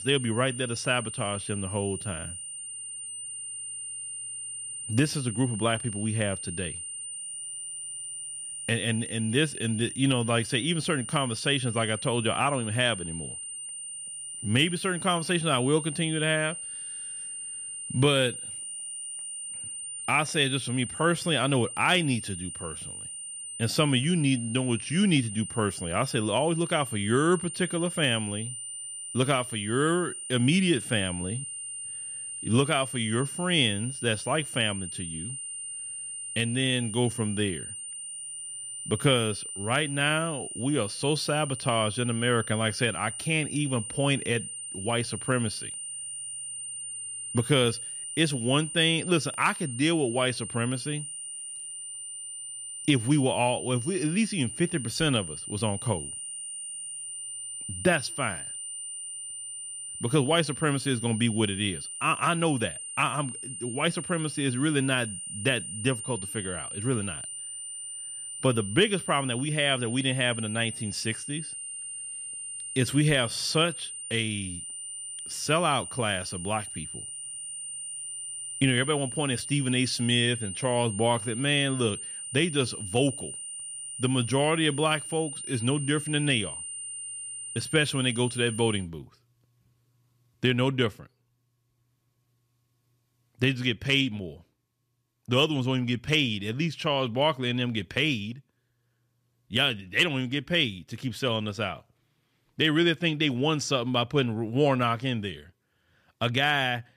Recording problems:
high-pitched whine; loud; until 1:29; 9 kHz, 8 dB below the speech

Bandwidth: 14.5 kHz